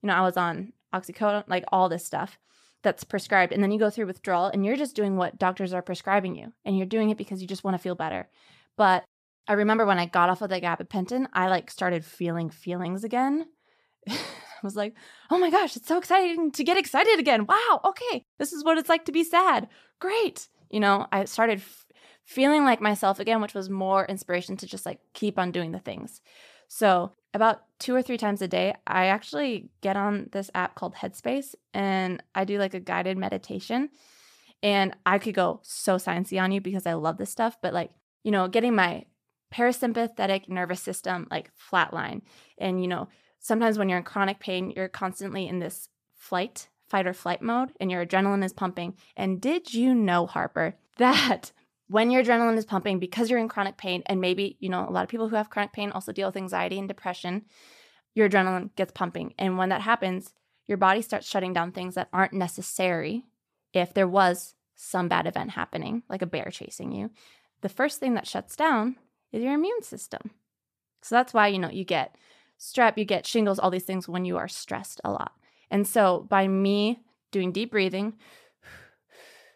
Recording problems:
none

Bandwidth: 14.5 kHz